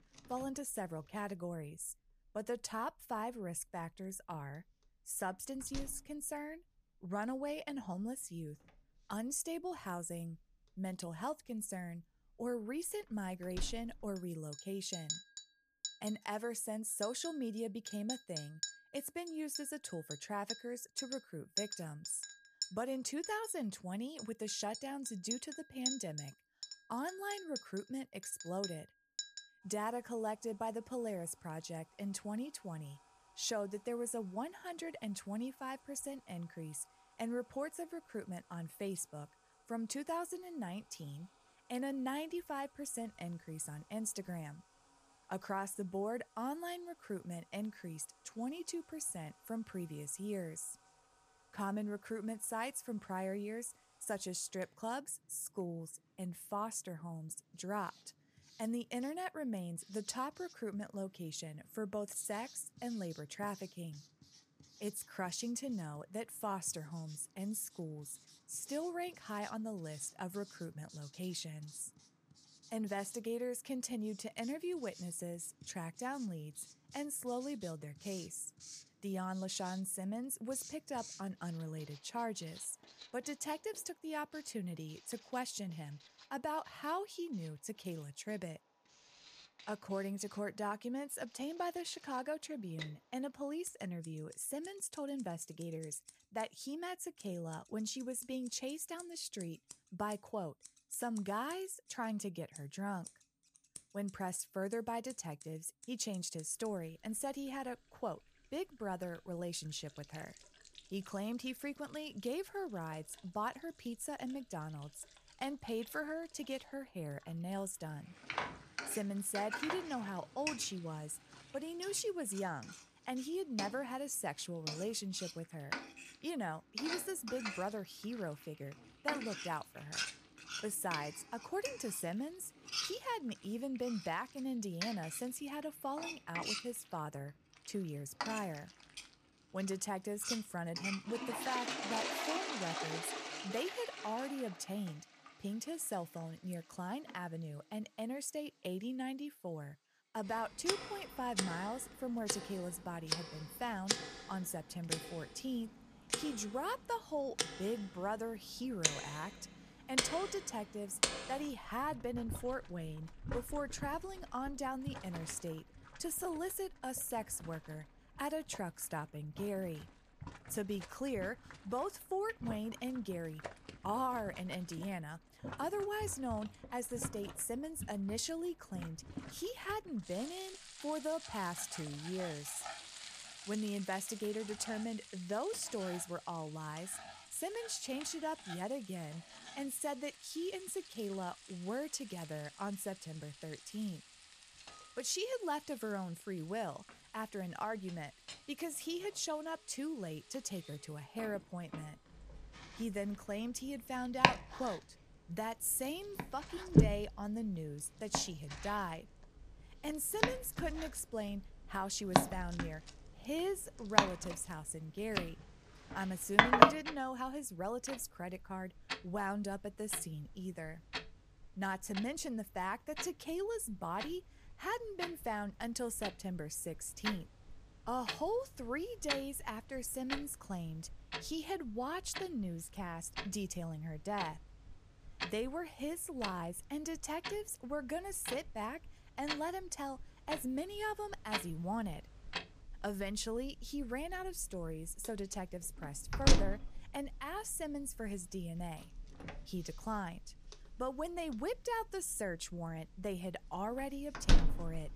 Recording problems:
household noises; very loud; throughout; 1 dB above the speech

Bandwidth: 14.5 kHz